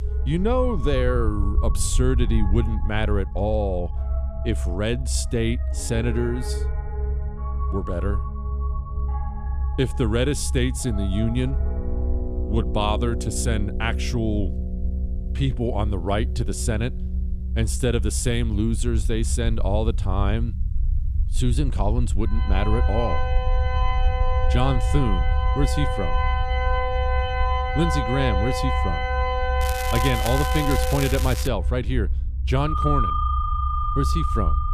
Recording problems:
background music; loud; throughout; 5 dB below the speech
crackling; loud; from 30 to 31 s; 7 dB below the speech
low rumble; noticeable; throughout; 20 dB below the speech

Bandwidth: 14.5 kHz